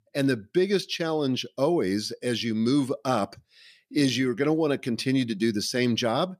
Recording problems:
none

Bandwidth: 14.5 kHz